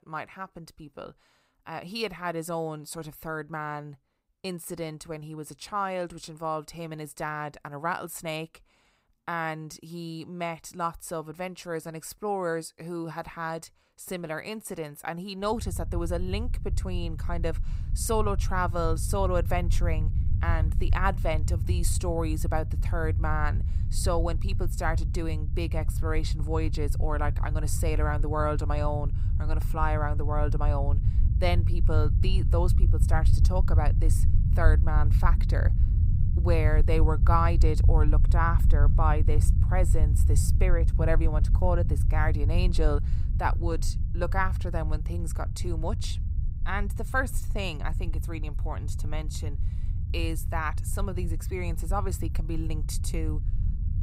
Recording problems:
low rumble; noticeable; from 16 s on; 10 dB below the speech

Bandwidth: 15.5 kHz